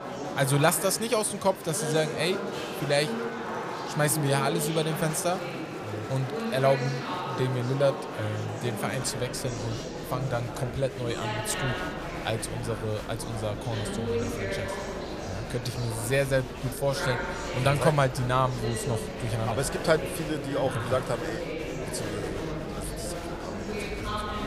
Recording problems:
murmuring crowd; loud; throughout; 5 dB below the speech

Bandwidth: 15 kHz